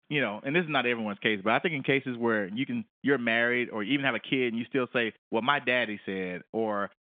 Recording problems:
phone-call audio; nothing above 3.5 kHz

